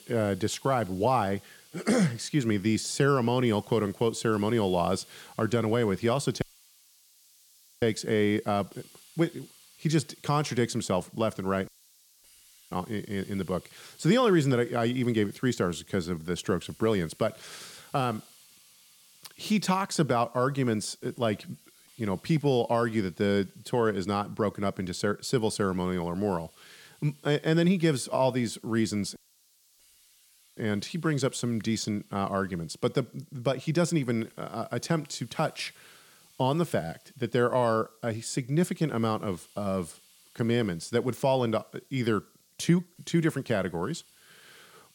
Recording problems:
hiss; faint; throughout; 25 dB below the speech
audio cutting out; at 6.5 s for 1.5 s, at 12 s for 1 s and at 29 s for 1.5 s

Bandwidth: 17 kHz